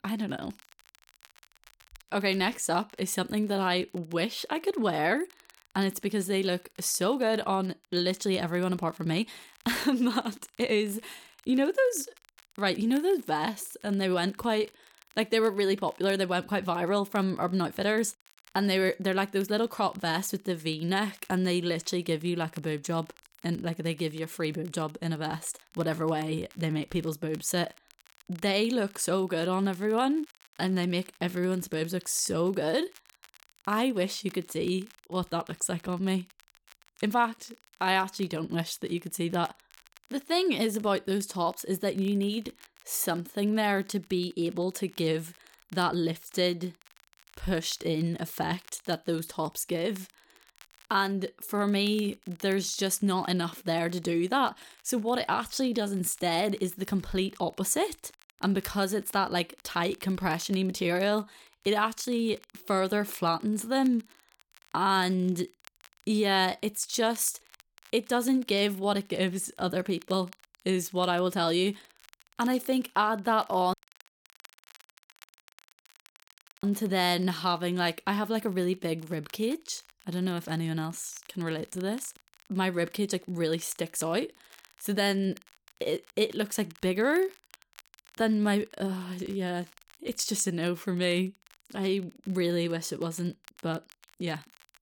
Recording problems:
crackle, like an old record; faint; 25 dB below the speech
audio cutting out; at 1:14 for 3 s

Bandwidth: 18 kHz